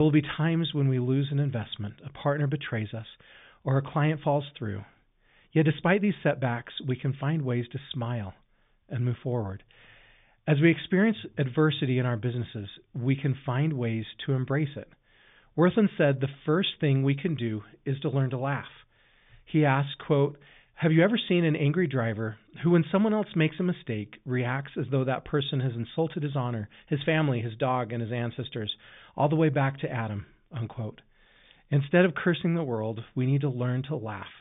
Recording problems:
high frequencies cut off; severe; nothing above 3.5 kHz
abrupt cut into speech; at the start

